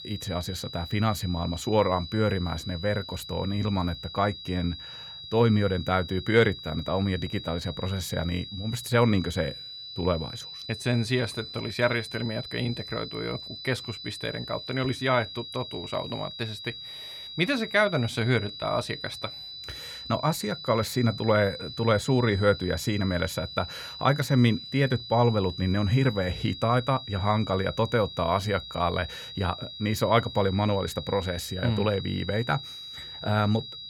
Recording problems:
high-pitched whine; noticeable; throughout; 4 kHz, 10 dB below the speech

